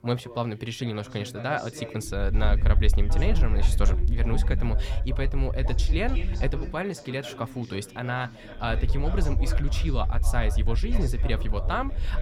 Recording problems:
background chatter; loud; throughout; 4 voices, 10 dB below the speech
low rumble; noticeable; from 2 to 6.5 s and from 8.5 s on; 15 dB below the speech

